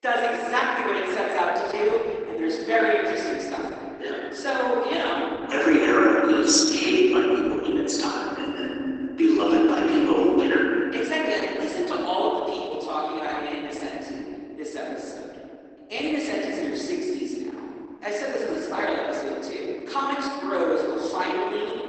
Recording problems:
off-mic speech; far
garbled, watery; badly; nothing above 8 kHz
room echo; noticeable; dies away in 2.6 s
thin; very slightly; fading below 300 Hz

